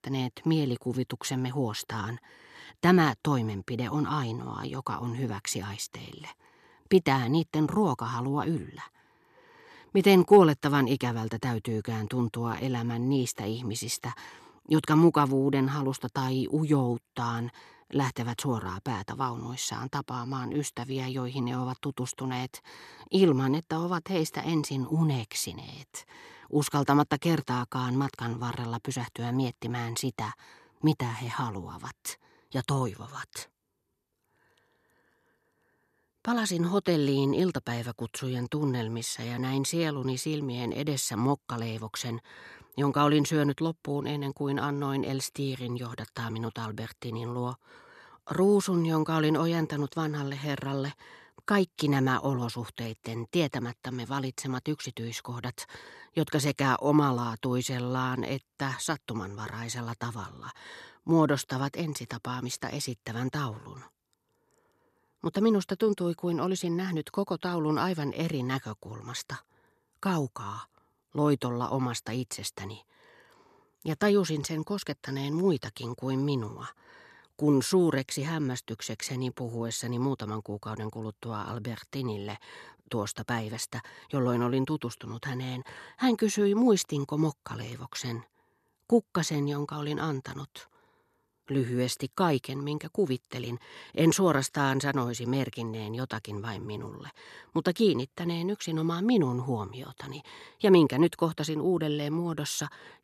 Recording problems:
none

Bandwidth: 13.5 kHz